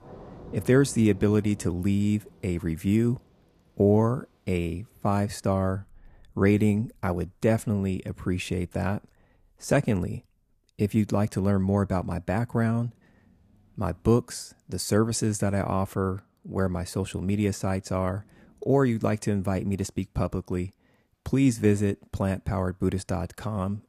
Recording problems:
rain or running water; faint; throughout; 25 dB below the speech

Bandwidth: 14.5 kHz